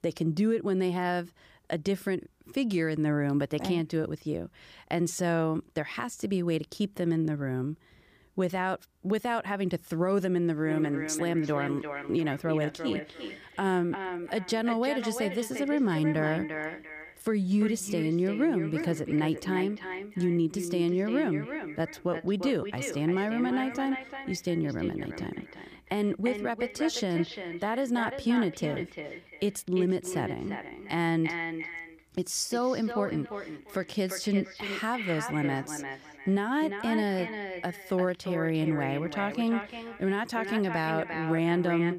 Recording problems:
echo of what is said; strong; from 11 s on; 350 ms later, 8 dB below the speech

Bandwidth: 15 kHz